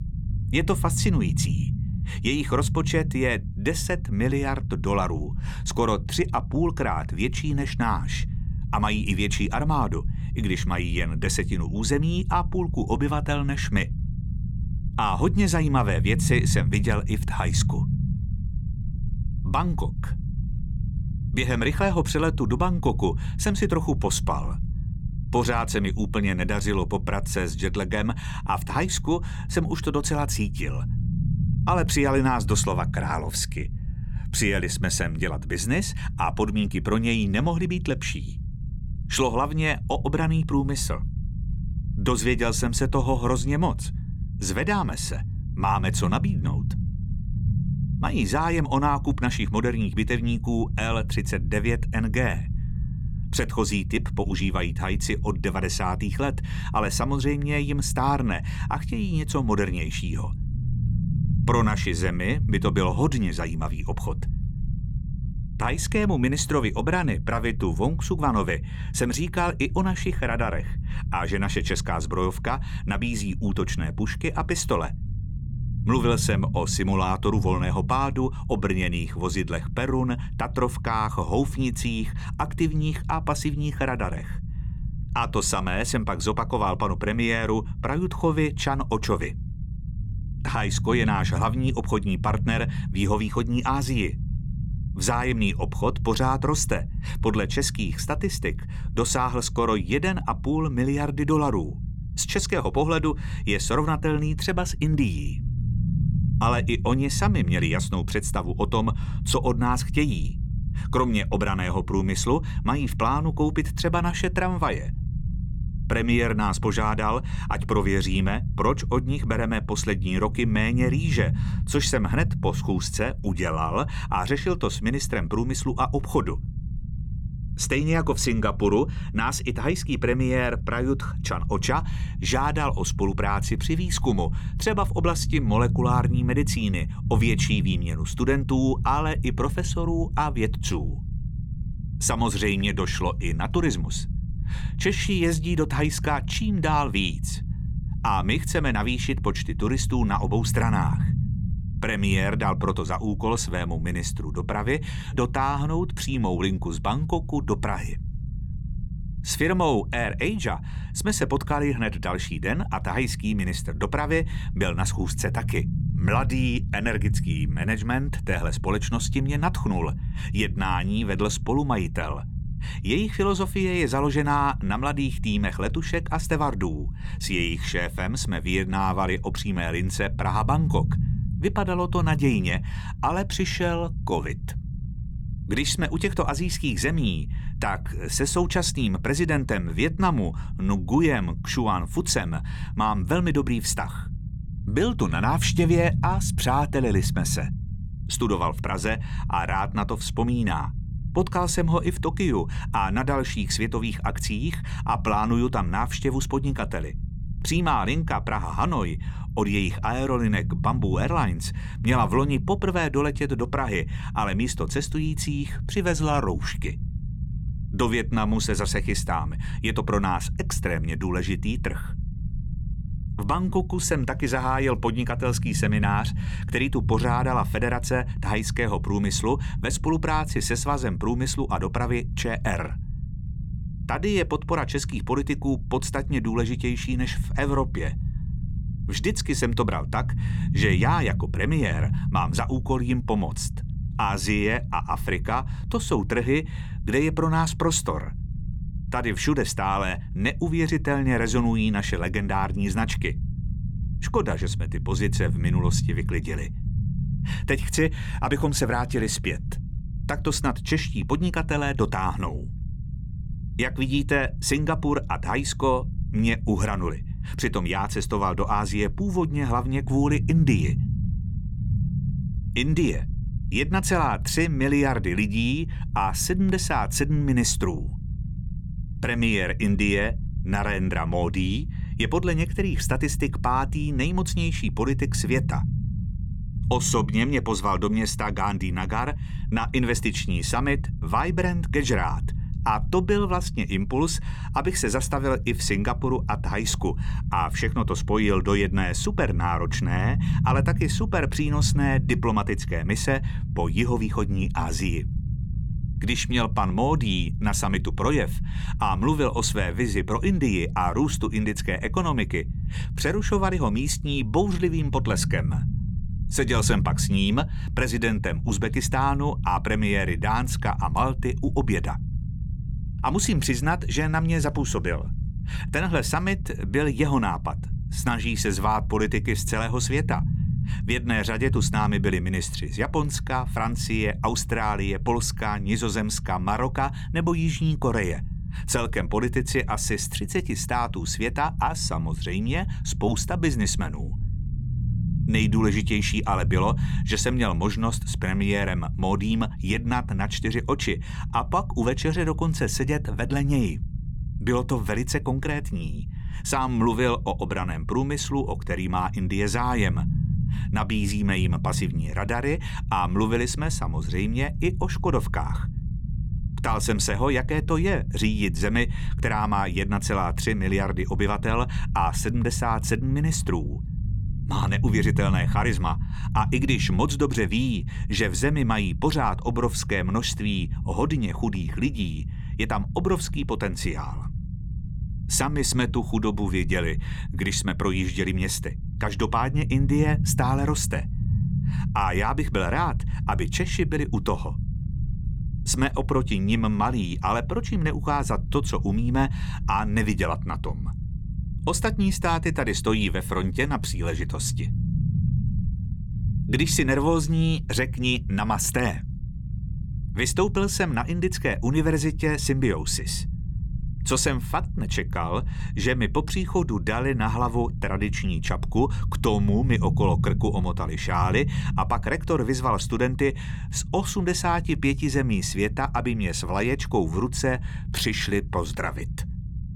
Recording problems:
low rumble; noticeable; throughout; 15 dB below the speech

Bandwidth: 17.5 kHz